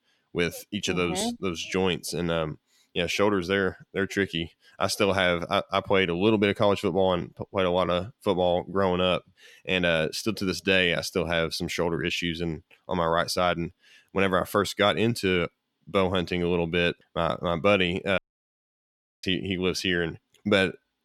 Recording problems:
audio cutting out; at 18 s for 1 s

